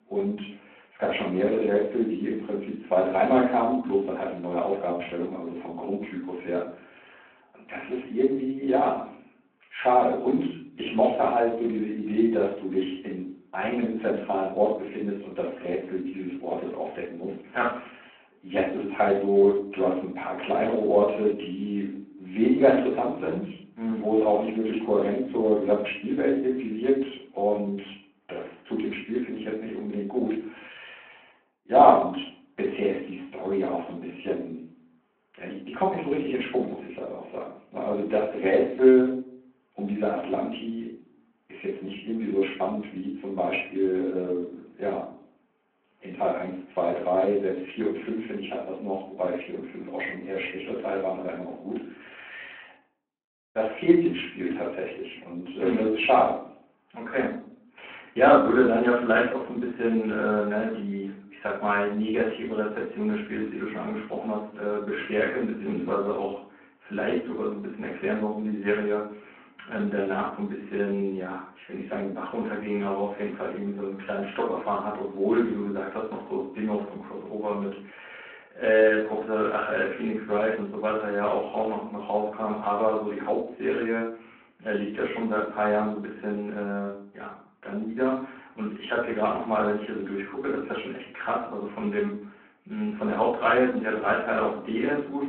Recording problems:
off-mic speech; far
room echo; noticeable; dies away in 0.5 s
phone-call audio

